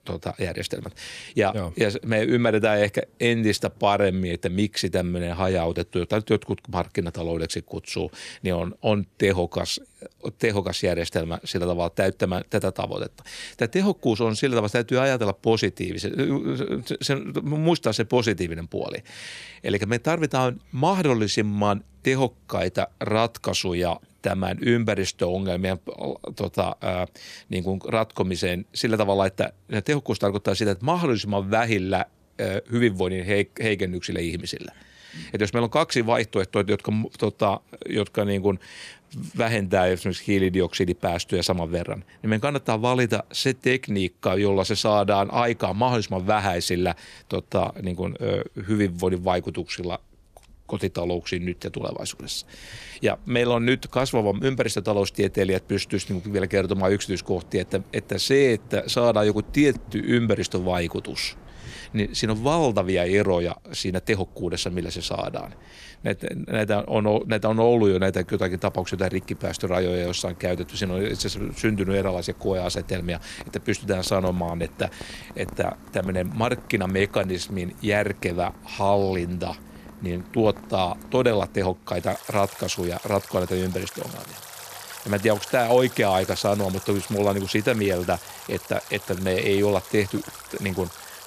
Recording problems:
rain or running water; noticeable; throughout; 20 dB below the speech

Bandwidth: 14.5 kHz